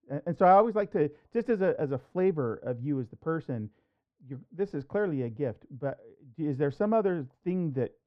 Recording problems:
muffled; very; fading above 3 kHz

